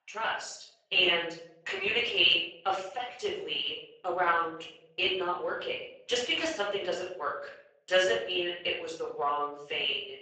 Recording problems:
off-mic speech; far
garbled, watery; badly; nothing above 7.5 kHz
thin; very; fading below 600 Hz
room echo; noticeable; dies away in 0.6 s

